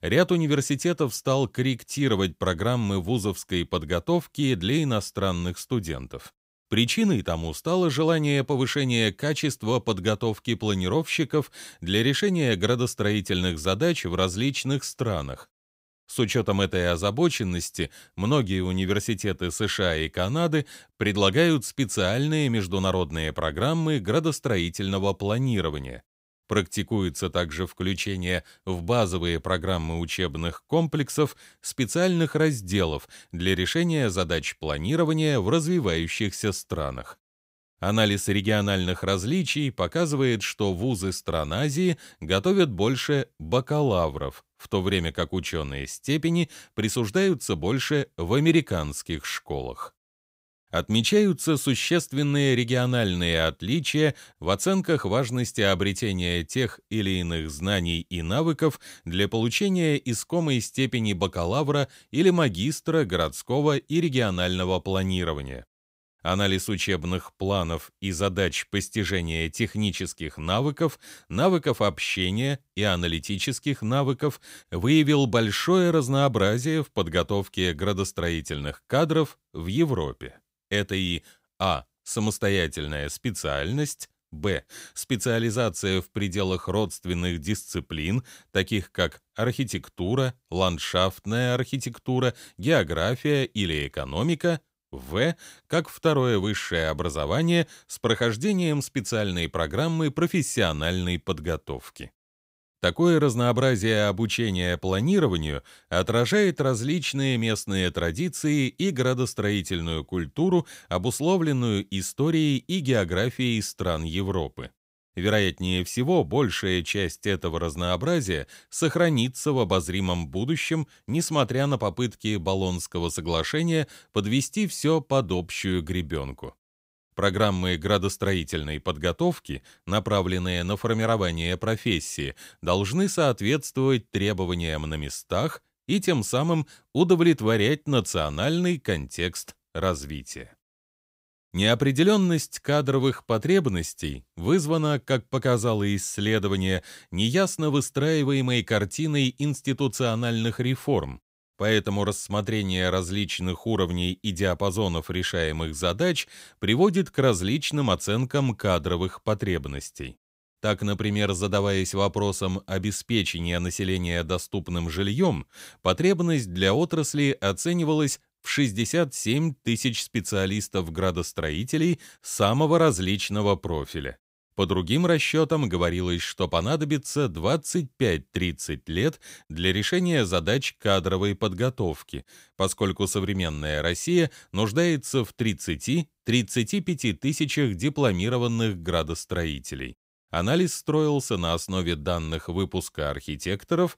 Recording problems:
none

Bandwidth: 15.5 kHz